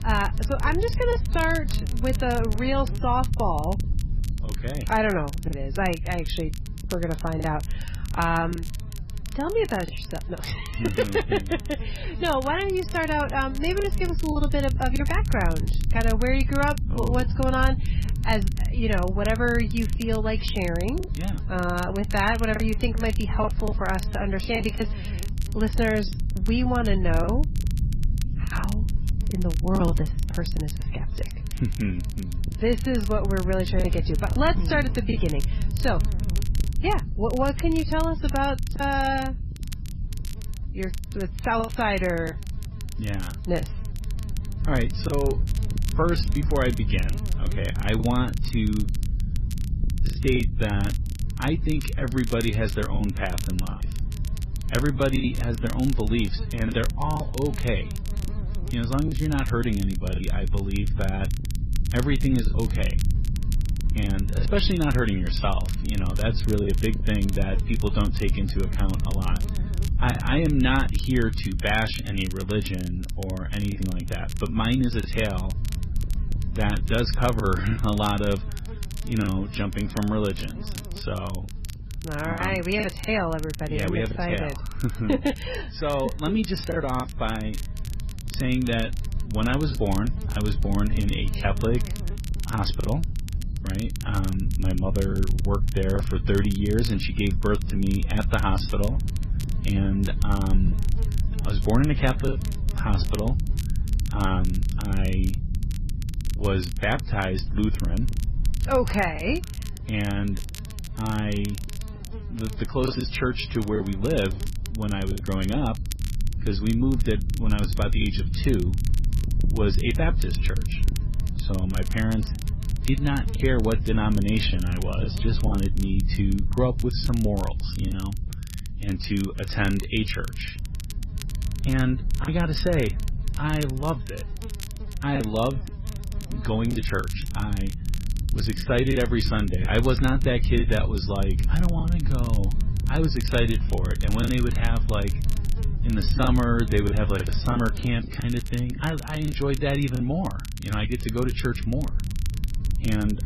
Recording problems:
garbled, watery; badly; nothing above 5.5 kHz
low rumble; noticeable; throughout; 15 dB below the speech
crackle, like an old record; noticeable; 15 dB below the speech
electrical hum; faint; throughout; 60 Hz, 25 dB below the speech
choppy; occasionally; 4% of the speech affected

